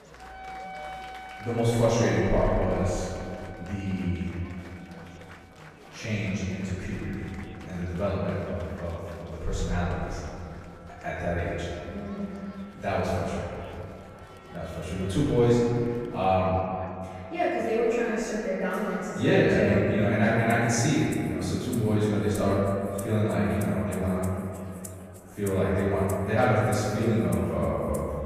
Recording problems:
room echo; strong; dies away in 2.5 s
off-mic speech; far
background music; faint; throughout; 20 dB below the speech
murmuring crowd; faint; throughout; 20 dB below the speech

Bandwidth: 14.5 kHz